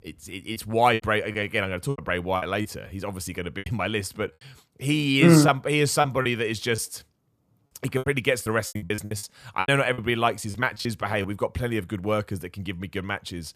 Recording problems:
choppy; very; from 0.5 to 2.5 s, from 3.5 to 7 s and from 7.5 to 11 s; 13% of the speech affected

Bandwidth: 14.5 kHz